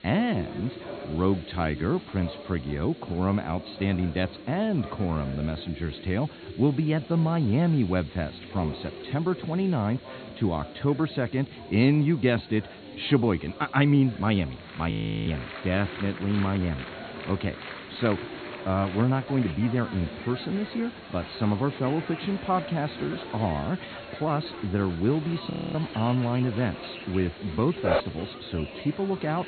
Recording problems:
high frequencies cut off; severe; nothing above 4.5 kHz
chatter from many people; noticeable; throughout; 15 dB below the speech
hiss; faint; throughout; 25 dB below the speech
audio freezing; at 15 s and at 26 s
dog barking; loud; at 28 s; peak 1 dB above the speech

